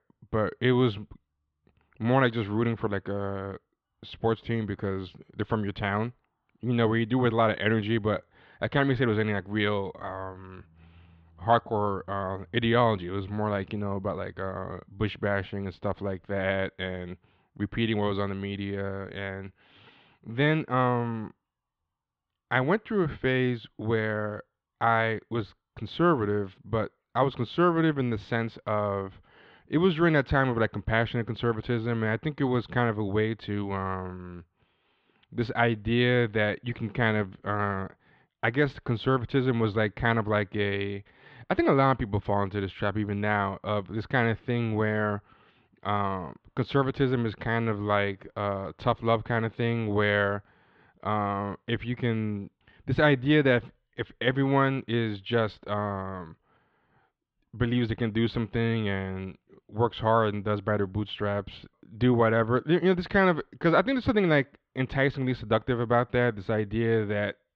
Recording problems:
muffled; very; fading above 3.5 kHz

